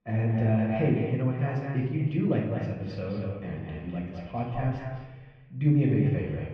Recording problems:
off-mic speech; far
muffled; very; fading above 2.5 kHz
echo of what is said; noticeable; throughout; 200 ms later, 15 dB below the speech
room echo; noticeable; dies away in 0.8 s

